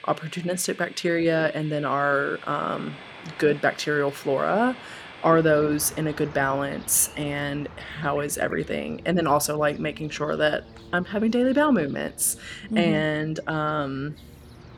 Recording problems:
train or aircraft noise; noticeable; throughout; 20 dB below the speech

